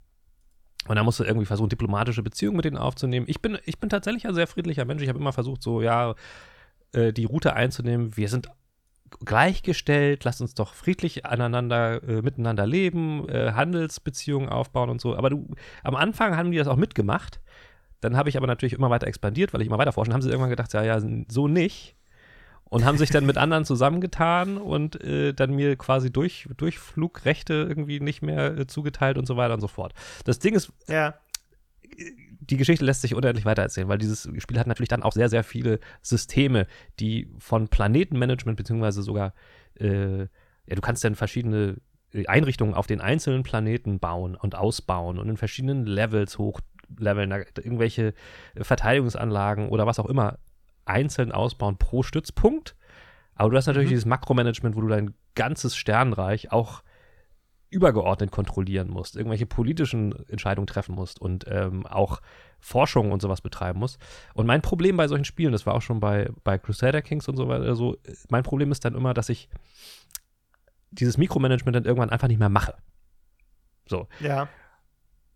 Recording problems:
uneven, jittery; strongly; from 9 s to 1:13

